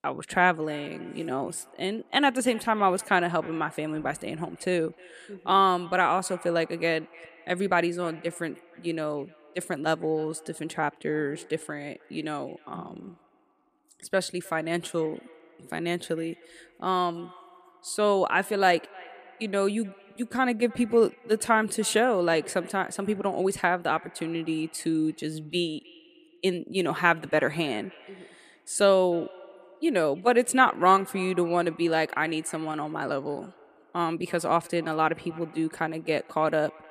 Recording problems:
echo of what is said; faint; throughout; 310 ms later, 25 dB below the speech

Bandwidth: 14.5 kHz